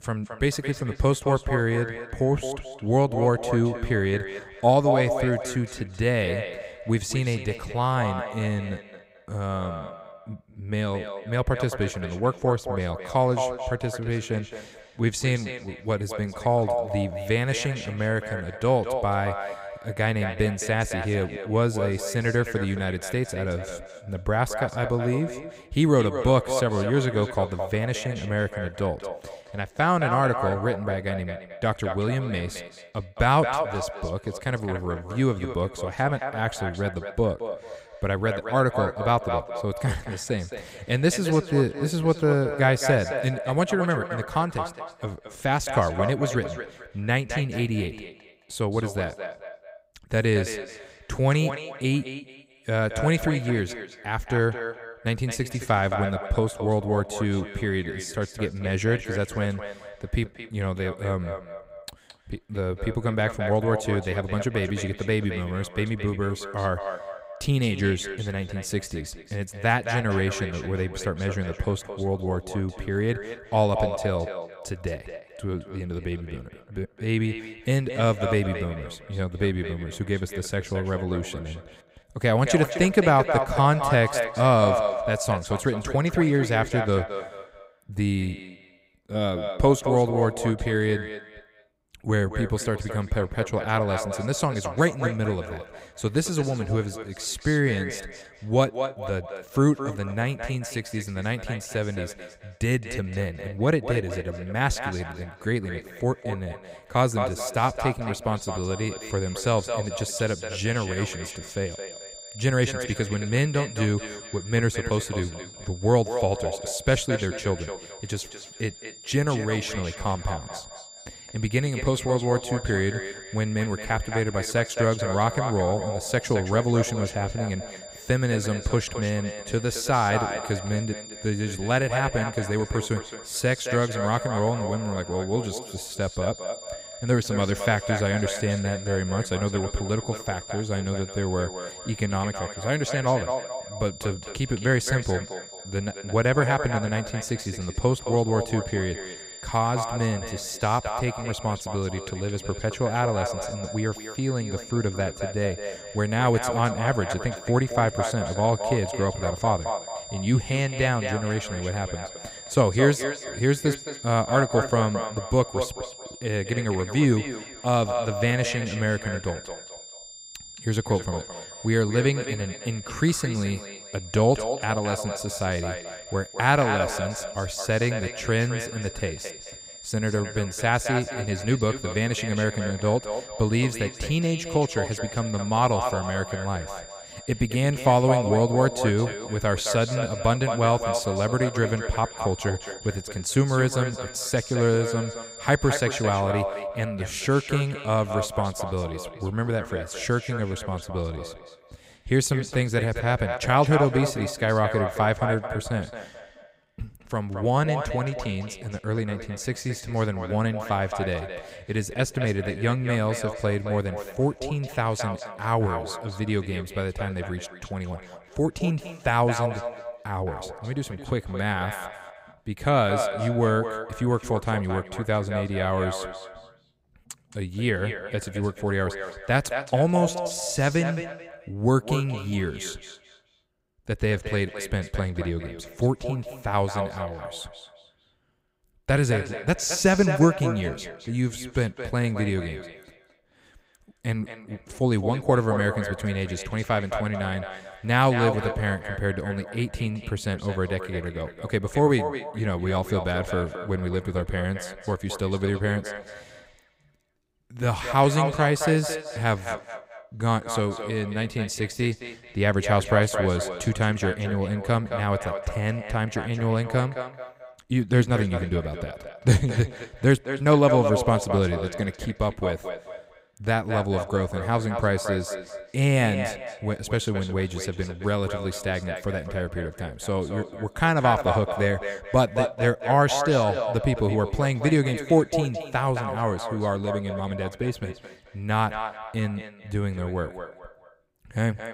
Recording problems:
echo of what is said; strong; throughout; 220 ms later, 8 dB below the speech
high-pitched whine; noticeable; from 1:48 to 3:16; 7 kHz, 15 dB below the speech

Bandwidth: 15.5 kHz